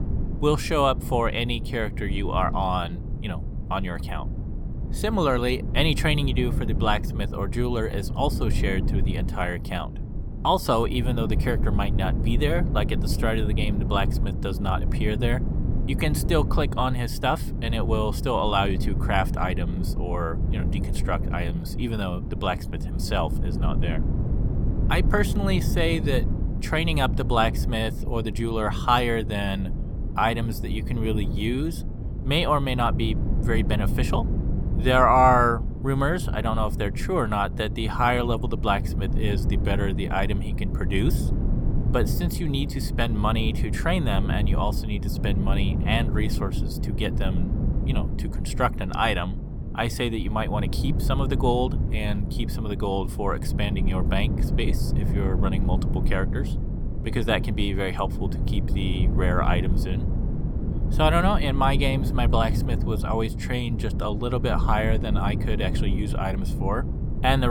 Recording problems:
wind noise on the microphone; occasional gusts; 10 dB below the speech
abrupt cut into speech; at the end

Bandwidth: 18 kHz